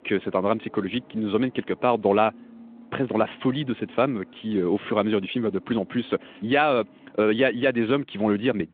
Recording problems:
phone-call audio; nothing above 3.5 kHz
traffic noise; faint; throughout; 25 dB below the speech

